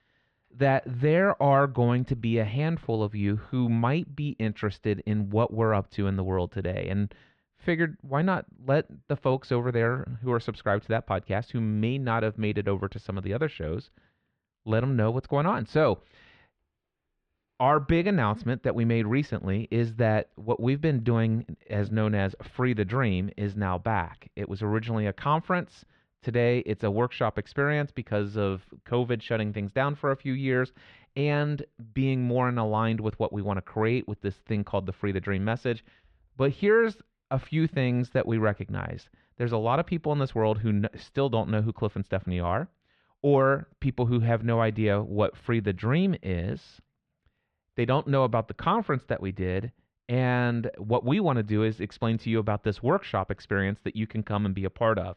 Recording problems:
muffled; very; fading above 2.5 kHz

